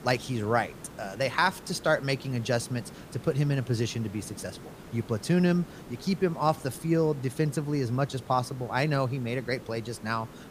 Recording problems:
hiss; noticeable; throughout; 15 dB below the speech

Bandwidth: 15 kHz